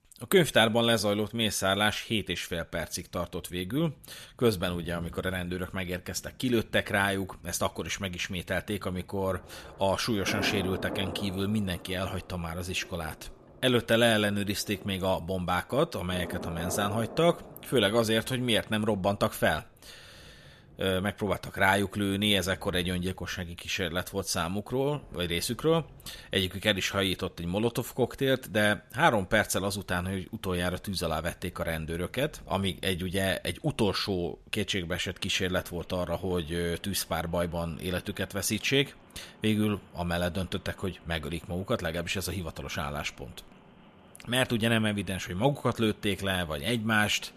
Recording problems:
rain or running water; noticeable; throughout; 20 dB below the speech

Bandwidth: 14 kHz